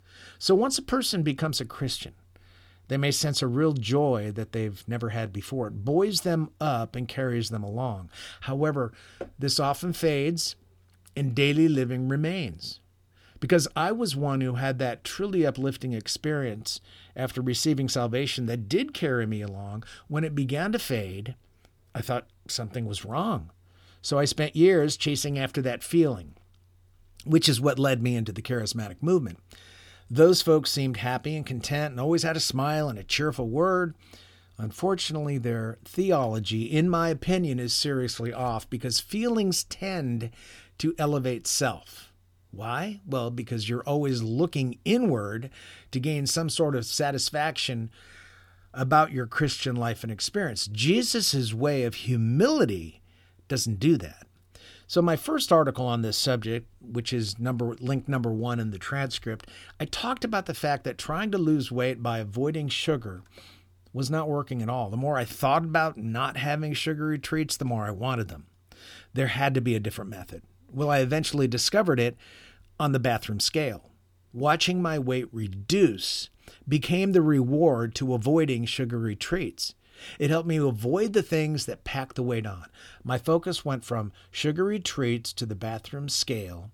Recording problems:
none

